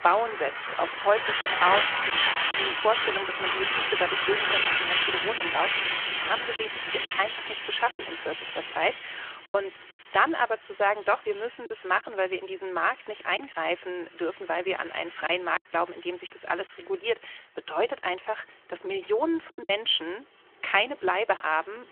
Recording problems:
phone-call audio; nothing above 3.5 kHz
traffic noise; very loud; throughout; 2 dB above the speech
choppy; occasionally; 3% of the speech affected

